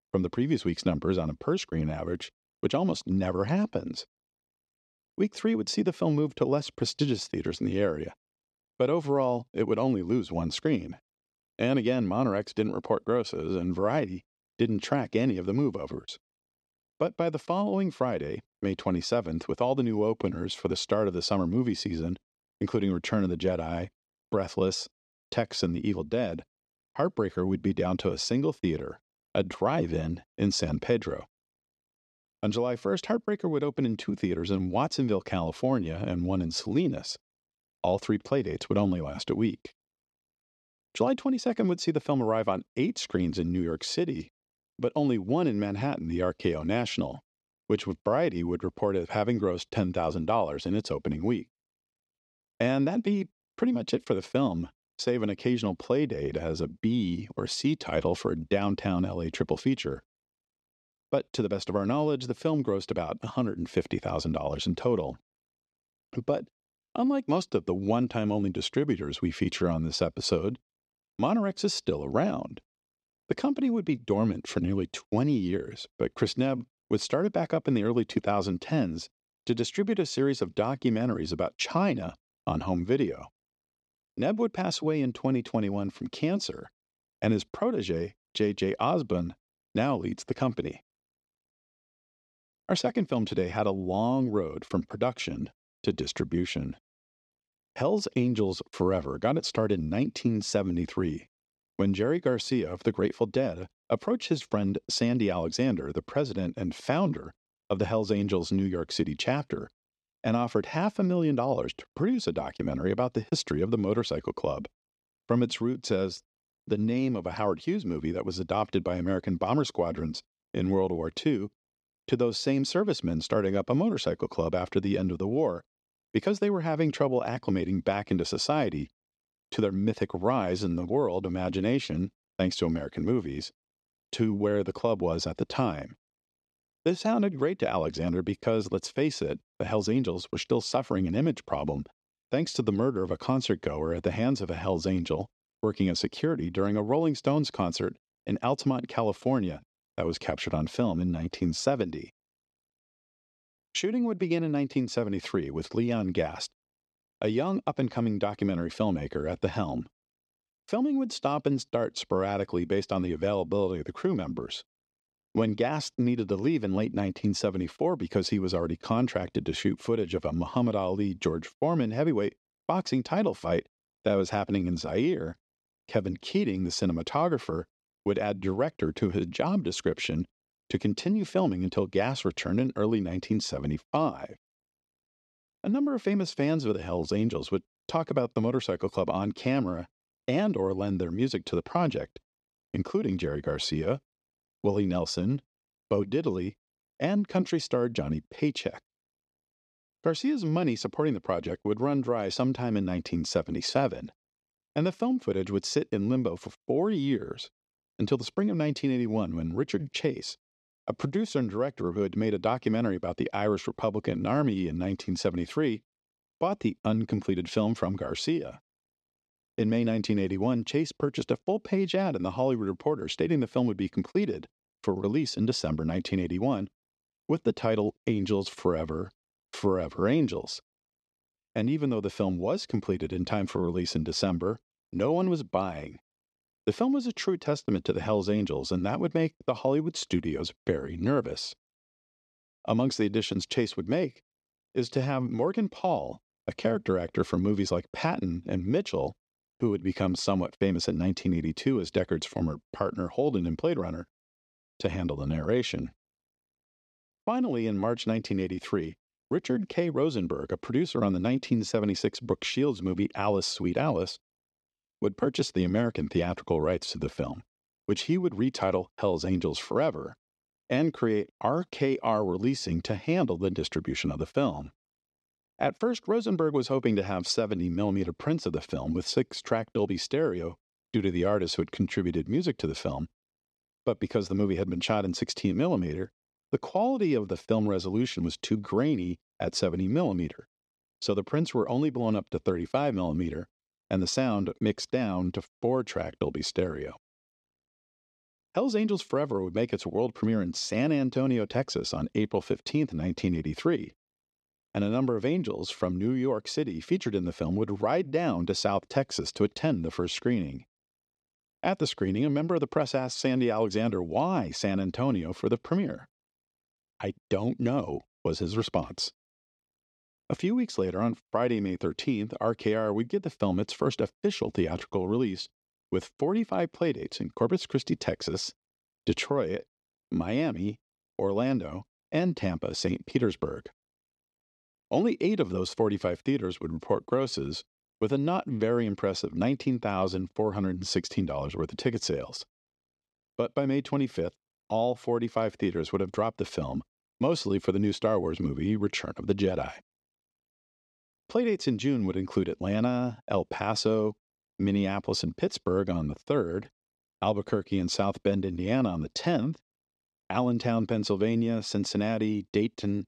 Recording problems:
none

